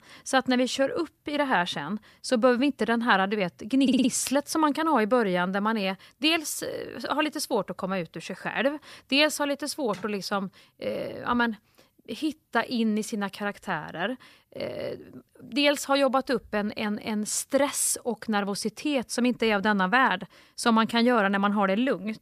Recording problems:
audio stuttering; at 4 s

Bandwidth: 14.5 kHz